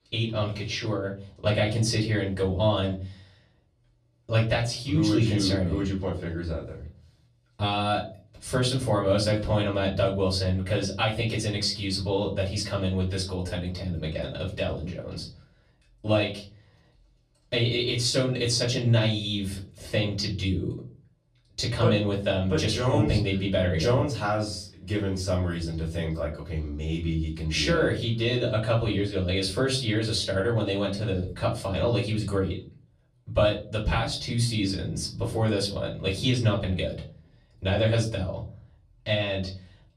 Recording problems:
off-mic speech; far
room echo; slight; dies away in 0.4 s

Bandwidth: 14 kHz